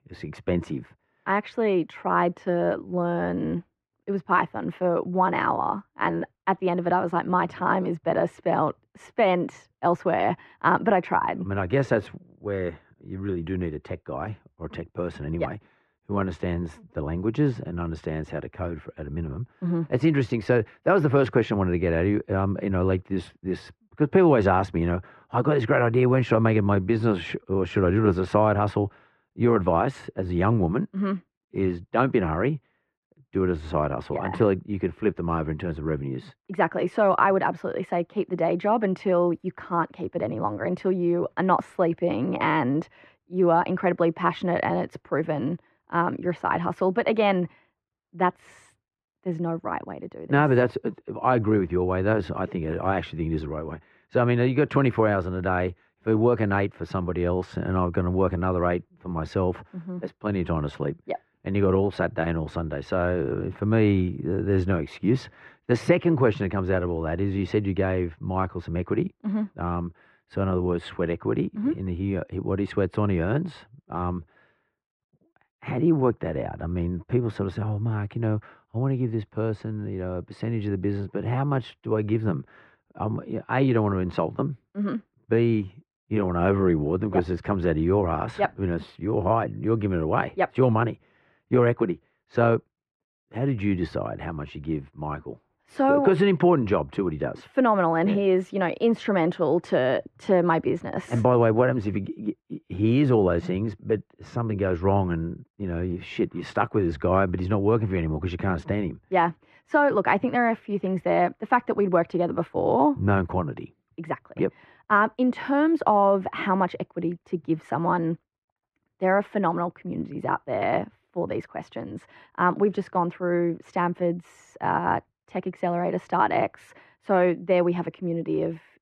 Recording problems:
muffled; very; fading above 1.5 kHz

